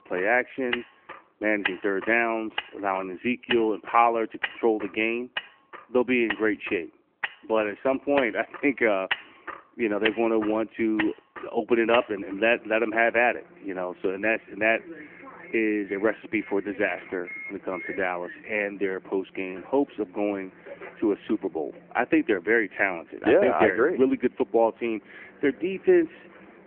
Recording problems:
phone-call audio
traffic noise; noticeable; throughout; 10 dB below the speech

